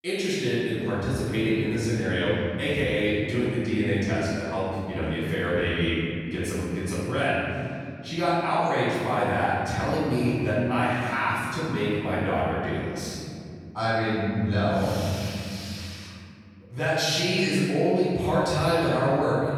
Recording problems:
room echo; strong; dies away in 2.8 s
off-mic speech; far

